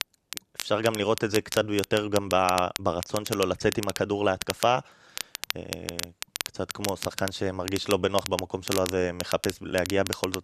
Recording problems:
crackle, like an old record; loud; 8 dB below the speech

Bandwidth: 13.5 kHz